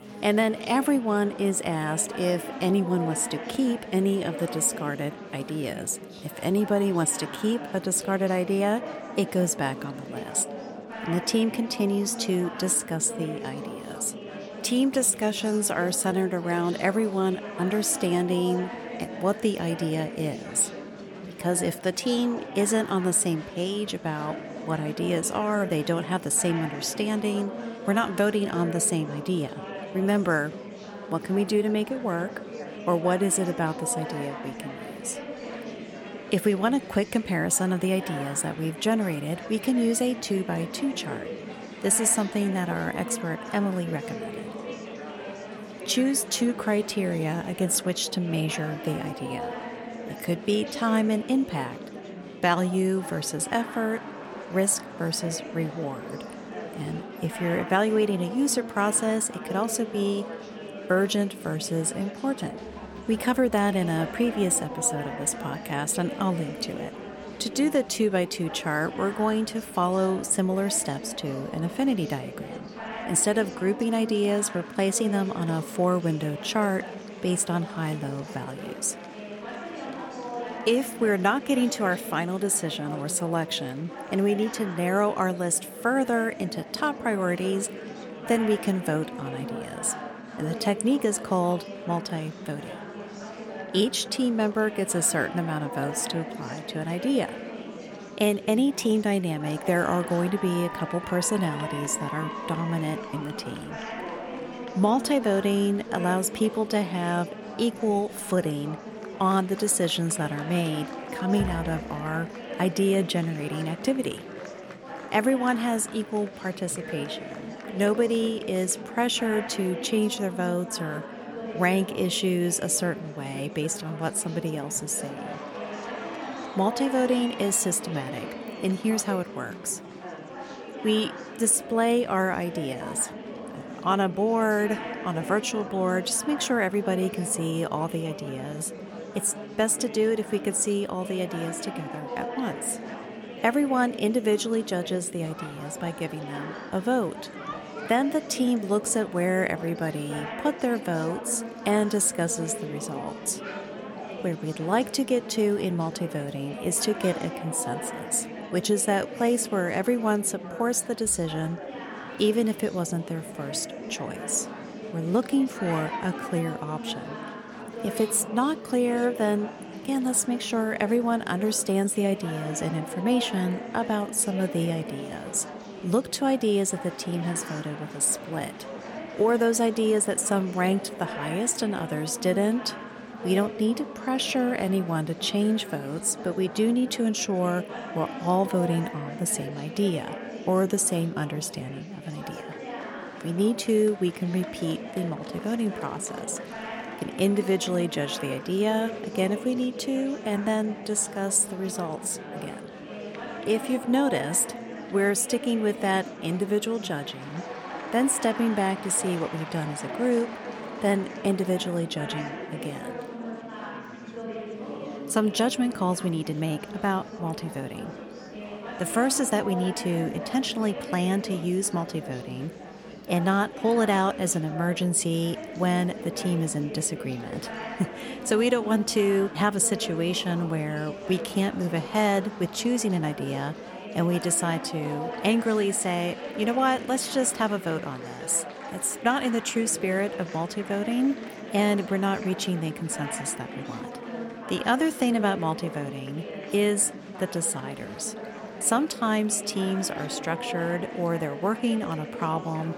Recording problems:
murmuring crowd; noticeable; throughout; 10 dB below the speech

